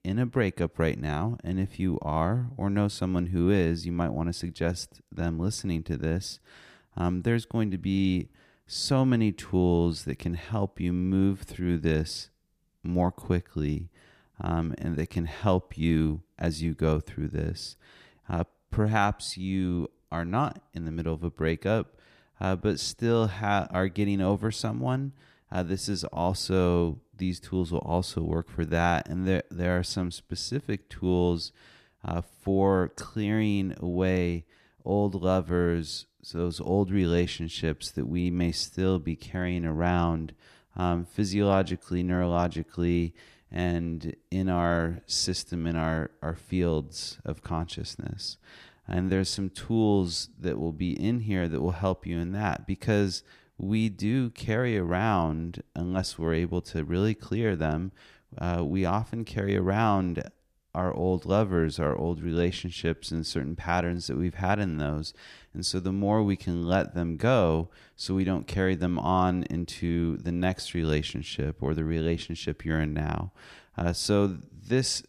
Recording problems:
none

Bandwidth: 14.5 kHz